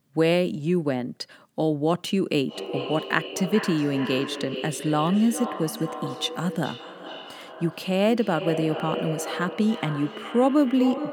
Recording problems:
echo of what is said; strong; from 2.5 s on; 420 ms later, 9 dB below the speech

